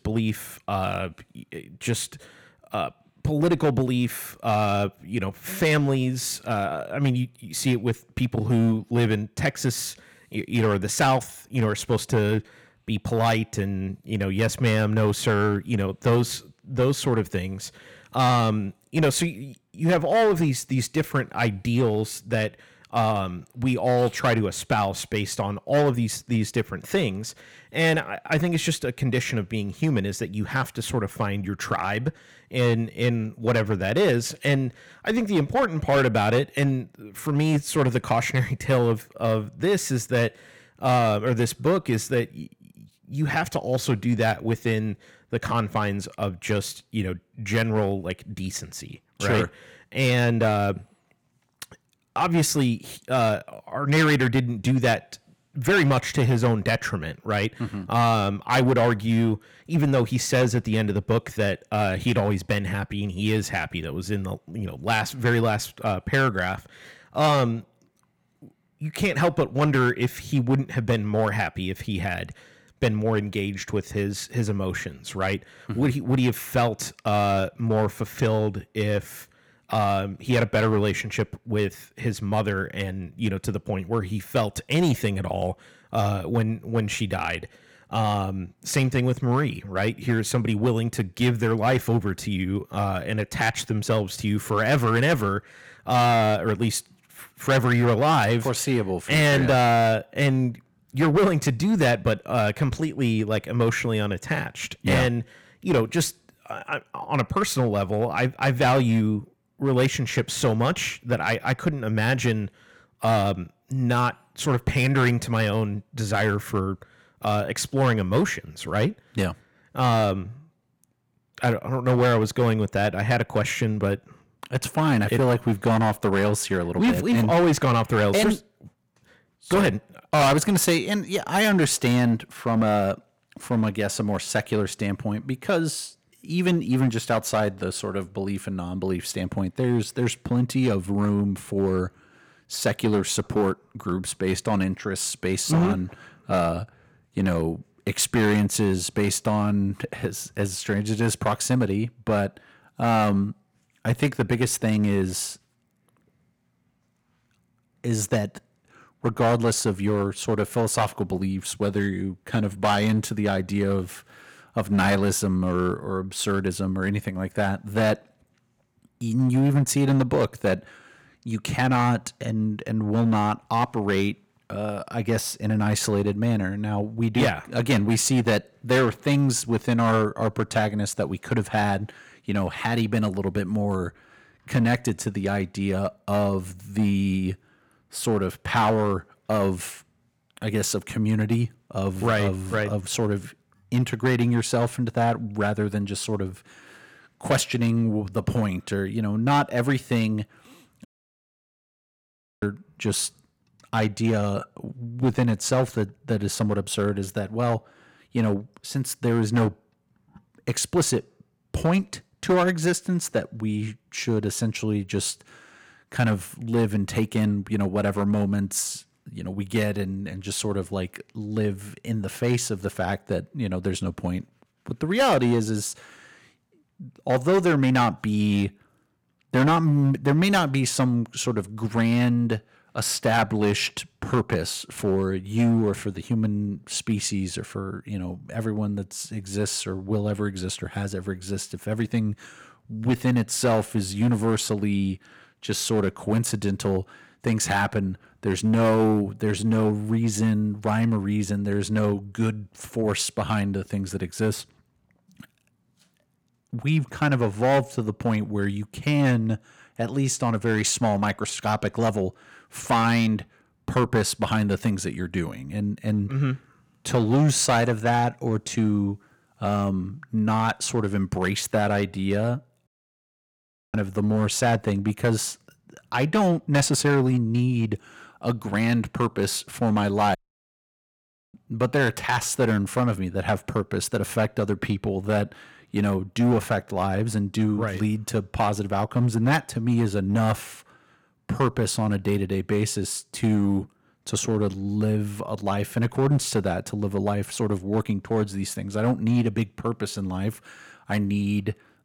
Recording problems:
distortion; slight; 5% of the sound clipped
audio cutting out; at 3:21 for 1.5 s, at 4:33 for 1 s and at 4:40 for 1 s

